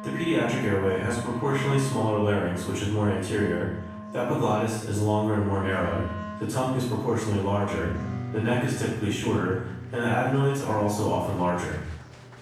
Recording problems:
room echo; strong; dies away in 0.7 s
off-mic speech; far
background music; noticeable; throughout; 10 dB below the speech
murmuring crowd; faint; throughout; 25 dB below the speech

